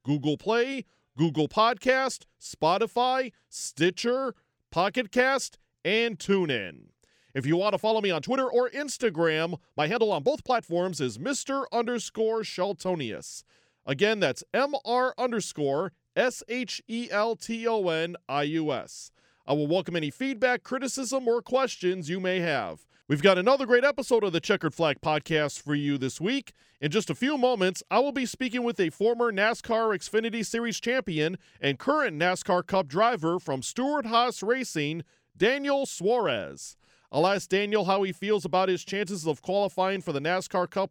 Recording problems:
uneven, jittery; strongly; from 3.5 to 36 s

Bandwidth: 18 kHz